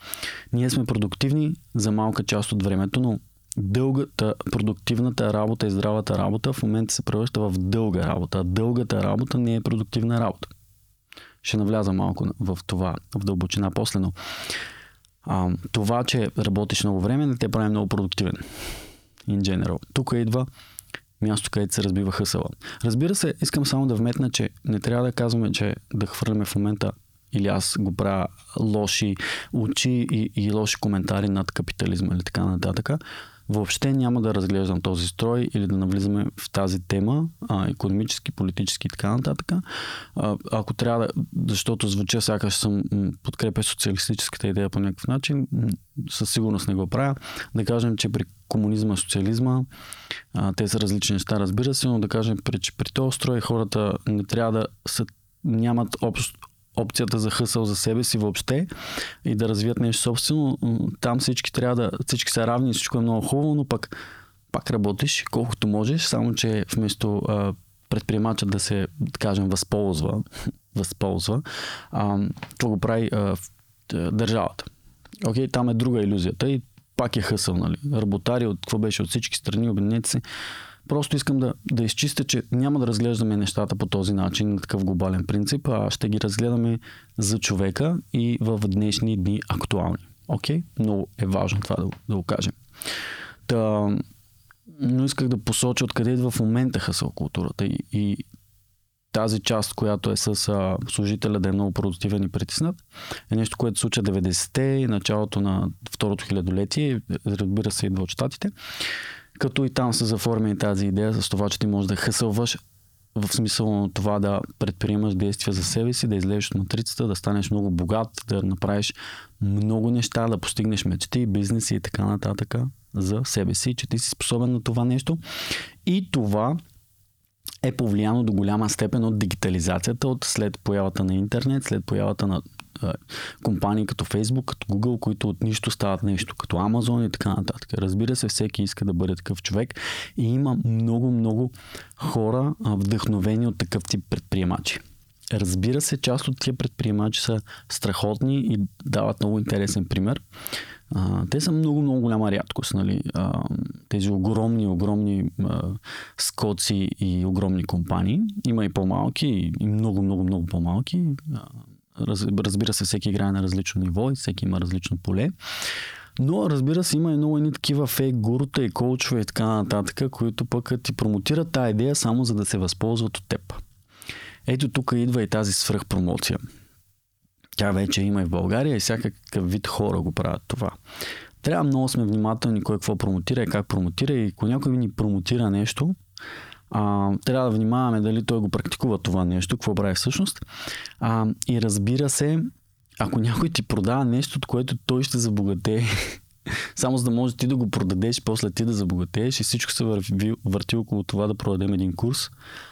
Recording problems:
squashed, flat; heavily

